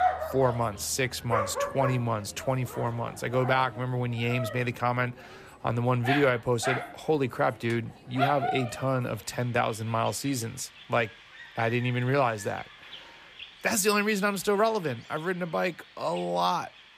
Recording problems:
animal sounds; loud; throughout; 8 dB below the speech

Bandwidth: 14.5 kHz